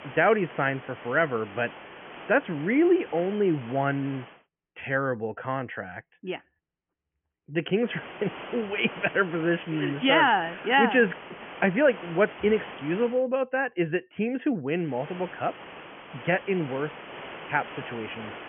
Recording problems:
high frequencies cut off; severe; nothing above 3 kHz
hiss; noticeable; until 4.5 s, from 8 to 13 s and from 15 s on; 15 dB below the speech

